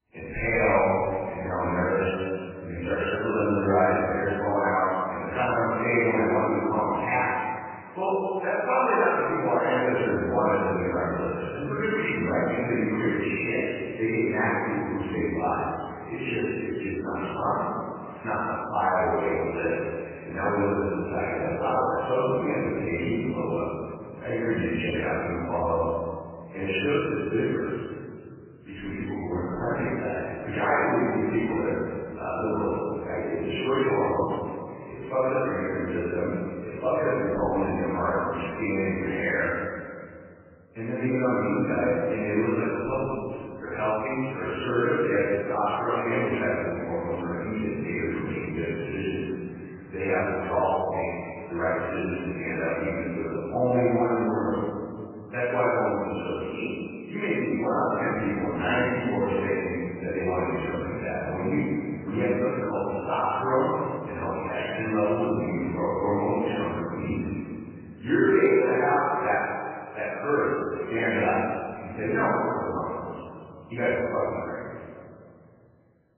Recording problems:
room echo; strong; dies away in 2.3 s
off-mic speech; far
garbled, watery; badly; nothing above 3 kHz

